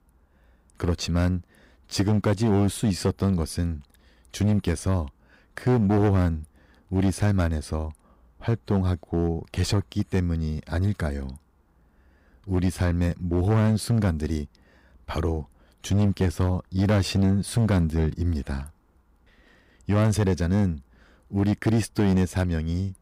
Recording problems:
distortion; slight; 7% of the sound clipped

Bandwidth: 15.5 kHz